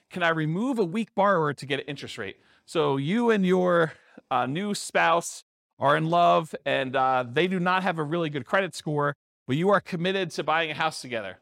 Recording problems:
none

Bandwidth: 16 kHz